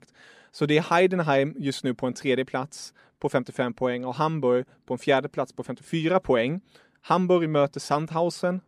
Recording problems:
none

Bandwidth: 14 kHz